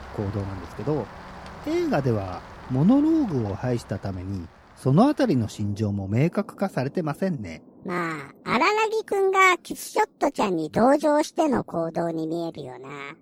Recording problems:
rain or running water; faint; throughout; 20 dB below the speech

